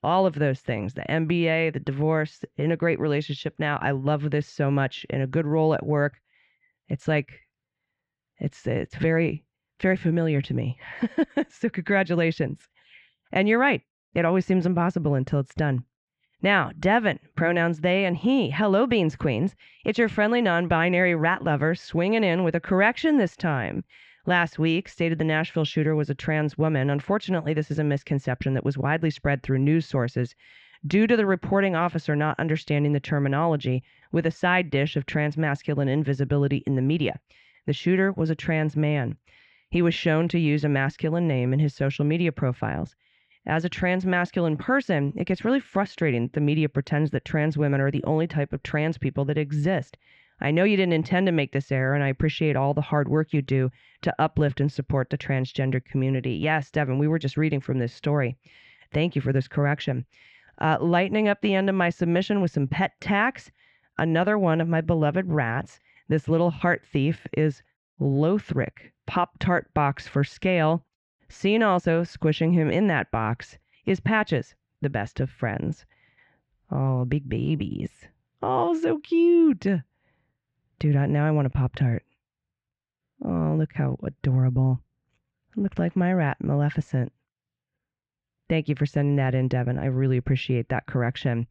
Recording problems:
muffled; slightly; fading above 2.5 kHz

